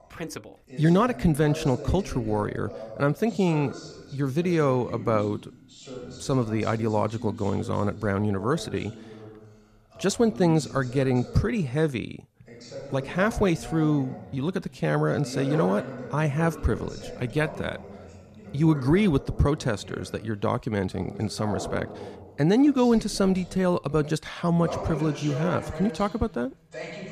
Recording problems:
voice in the background; noticeable; throughout; 15 dB below the speech

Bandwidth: 14.5 kHz